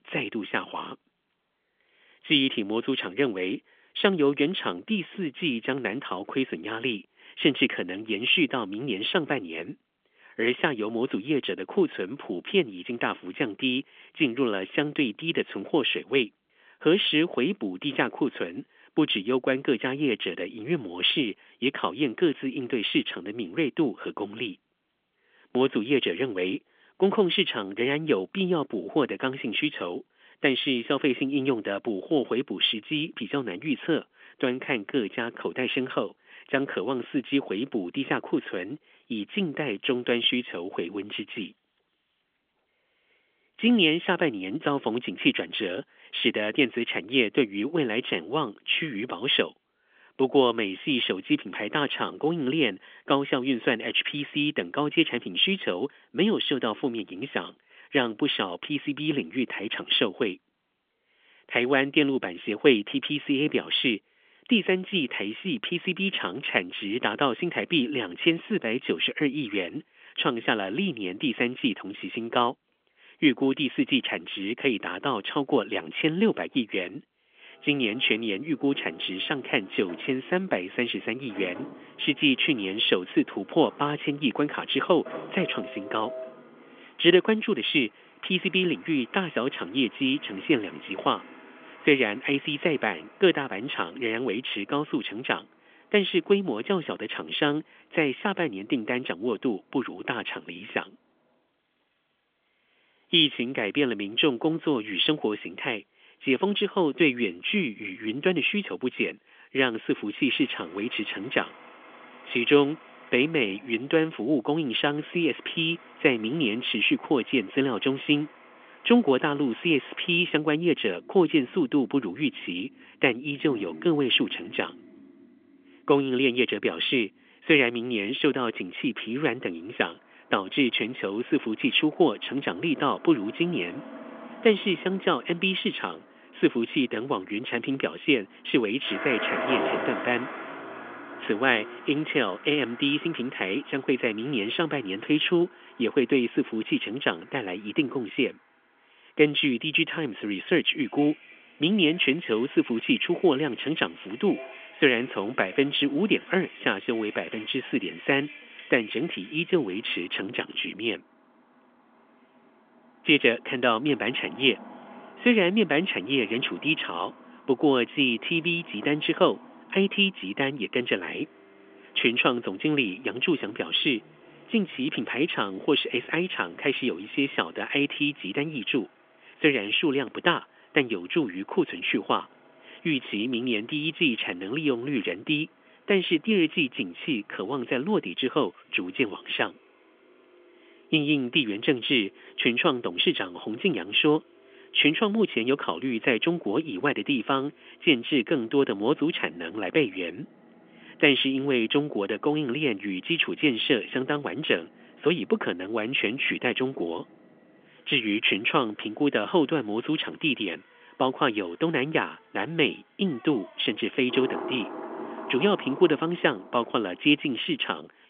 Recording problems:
phone-call audio; nothing above 3.5 kHz
traffic noise; noticeable; from 1:18 on; 20 dB below the speech

